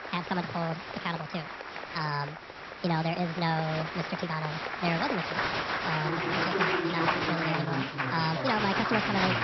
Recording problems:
wrong speed and pitch; too fast and too high; 1.5 times normal speed
high frequencies cut off; noticeable; nothing above 5.5 kHz
crowd noise; very loud; throughout; 1 dB above the speech
hiss; faint; throughout; 20 dB below the speech

